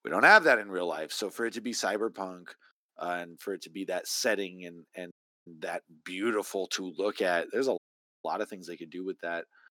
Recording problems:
thin; somewhat; fading below 250 Hz
audio cutting out; at 5 s and at 8 s

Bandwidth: 17.5 kHz